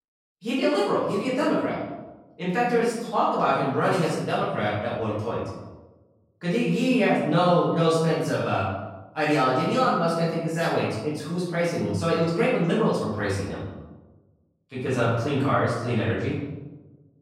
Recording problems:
off-mic speech; far
room echo; noticeable; dies away in 1.1 s

